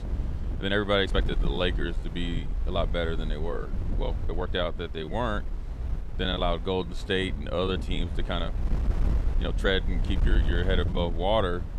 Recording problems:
wind noise on the microphone; occasional gusts; 15 dB below the speech
uneven, jittery; strongly; from 0.5 to 11 s

